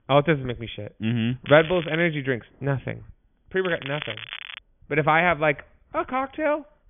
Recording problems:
high frequencies cut off; severe; nothing above 3.5 kHz
crackling; noticeable; at 1.5 s and at 3.5 s; 10 dB below the speech

